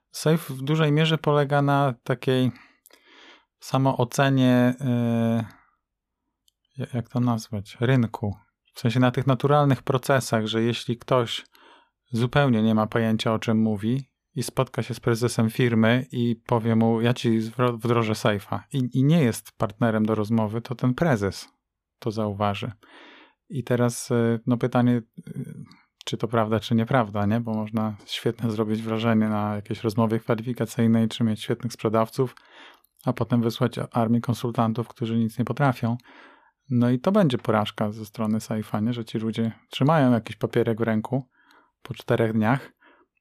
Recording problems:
none

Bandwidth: 14.5 kHz